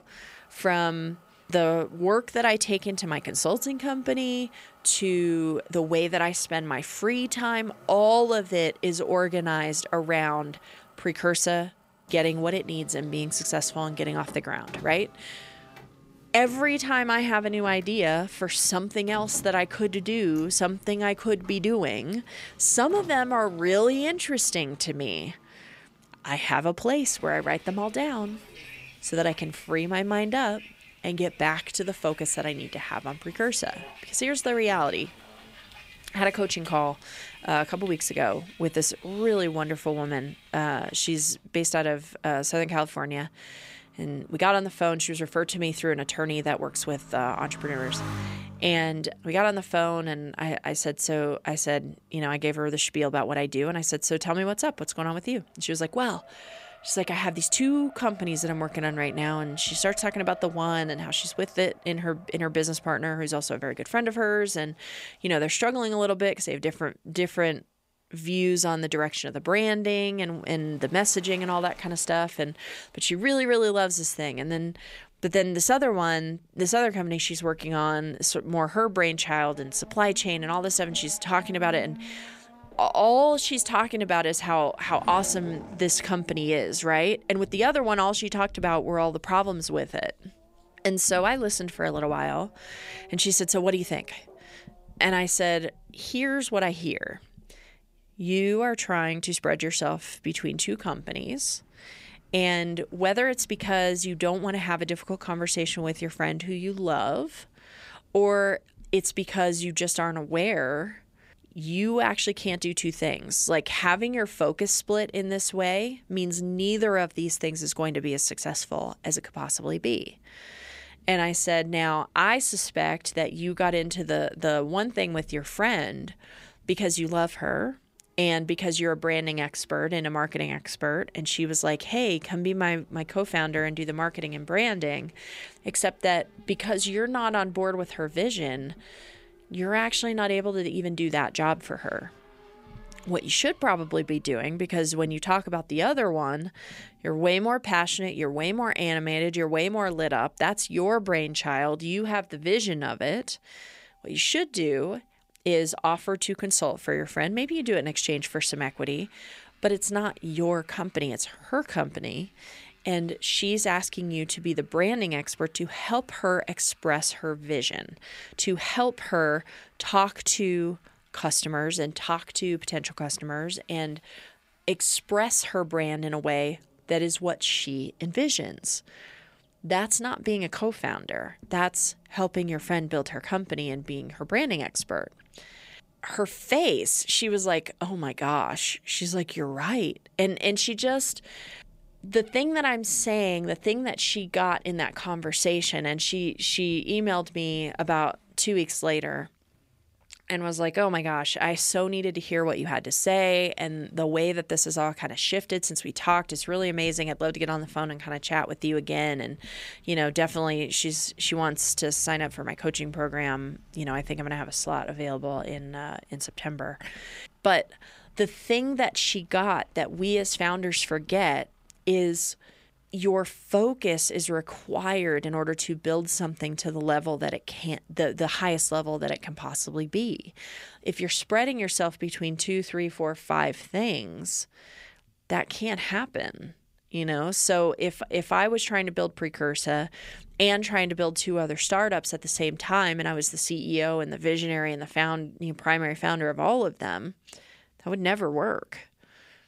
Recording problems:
traffic noise; faint; throughout; 25 dB below the speech

